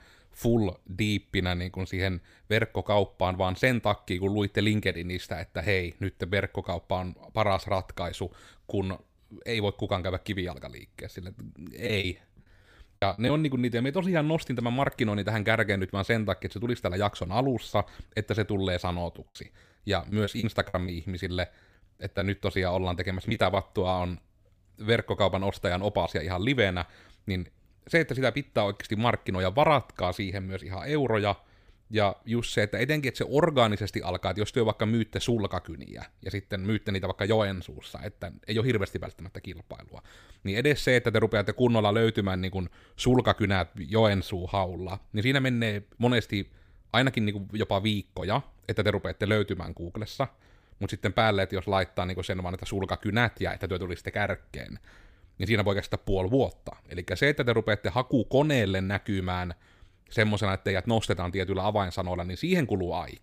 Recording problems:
choppy; very; from 12 to 13 s and from 19 to 24 s; 11% of the speech affected

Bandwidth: 15 kHz